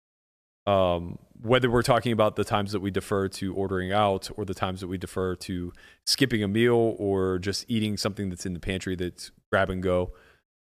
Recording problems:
none

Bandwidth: 14.5 kHz